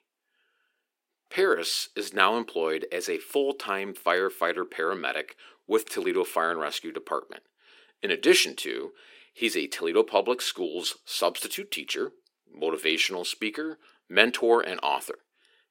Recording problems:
thin; somewhat; fading below 350 Hz

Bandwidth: 16.5 kHz